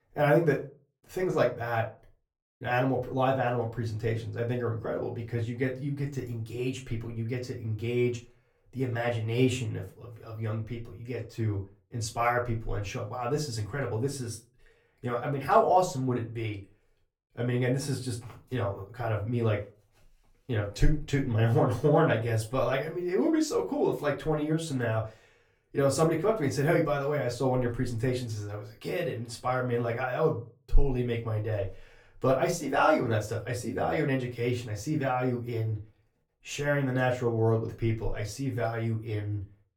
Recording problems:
off-mic speech; far
room echo; very slight; dies away in 0.3 s

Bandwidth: 17 kHz